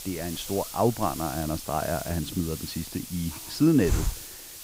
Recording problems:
hiss; loud; throughout; 7 dB below the speech

